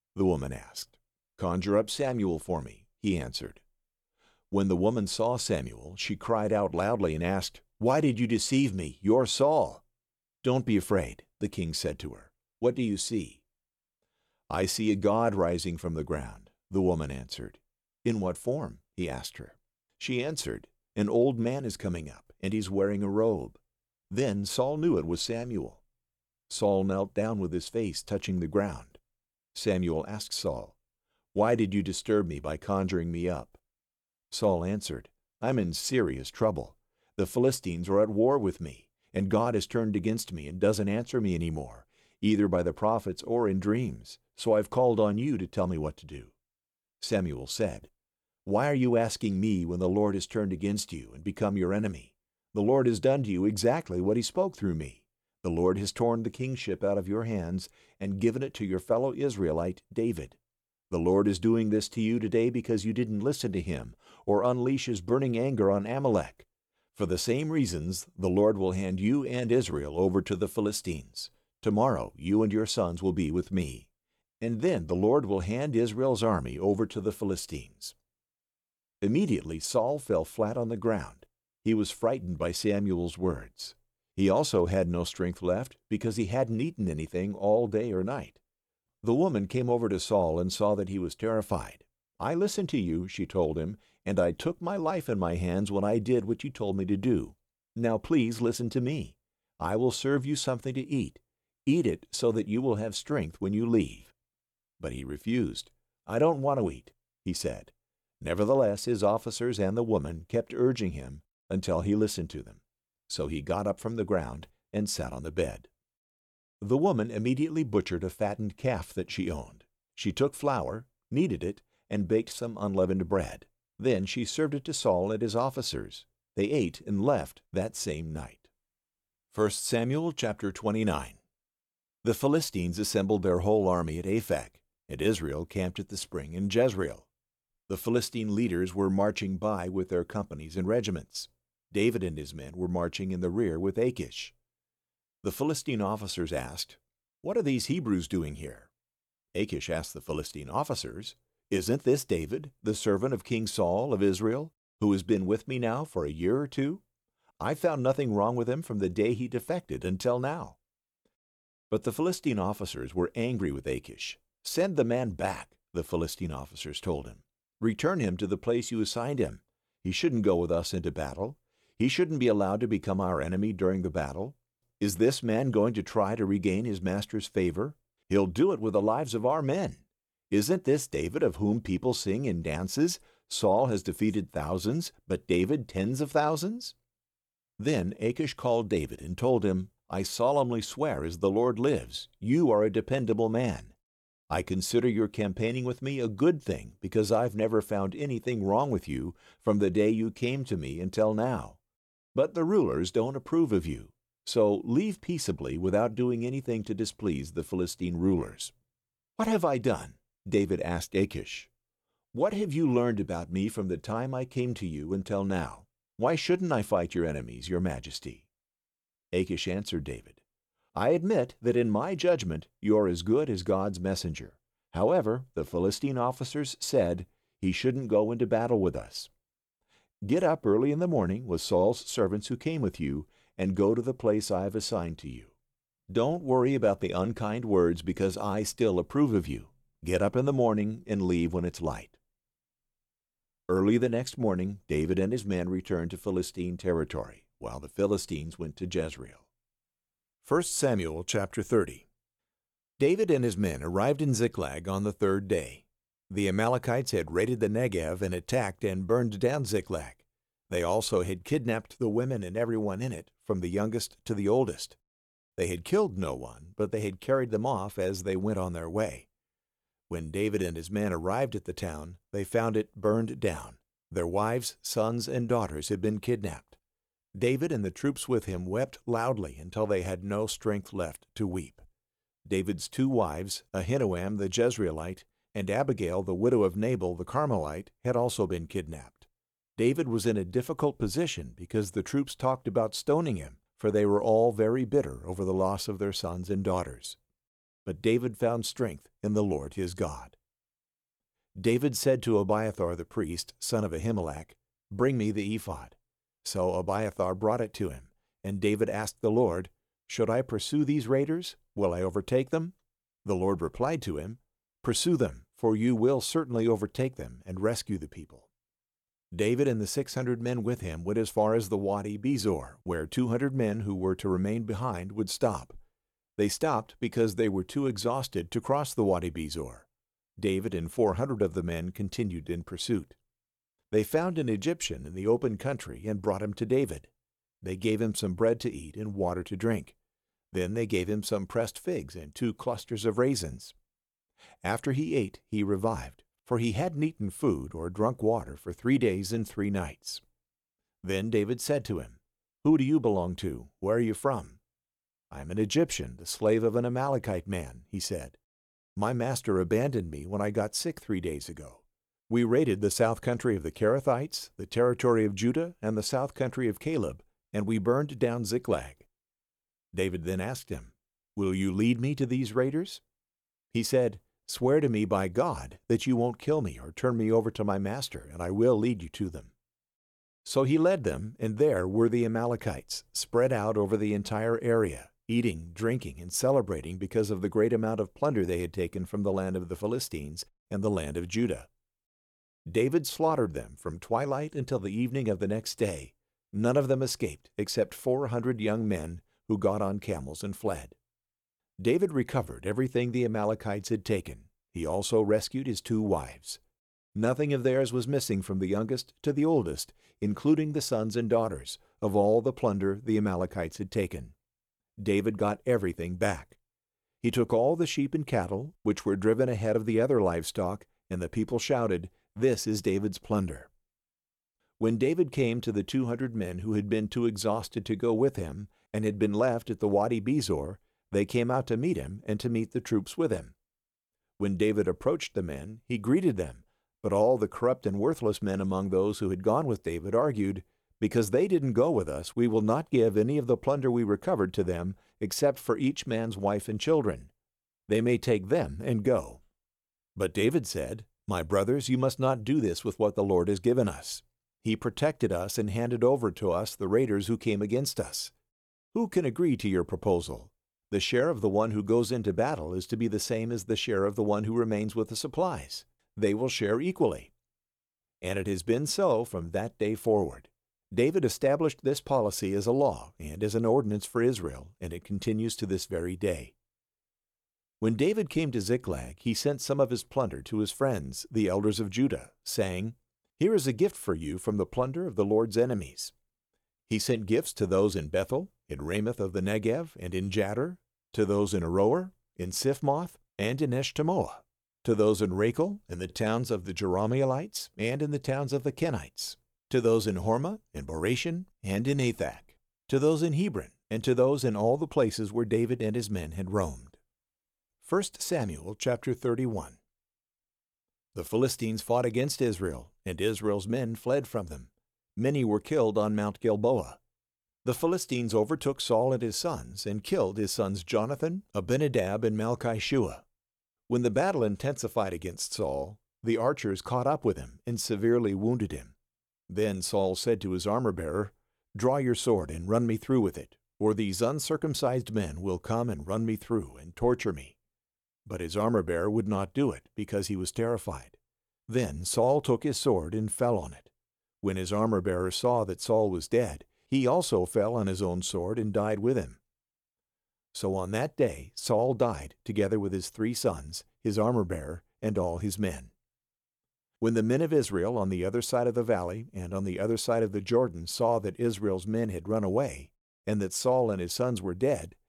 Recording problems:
none

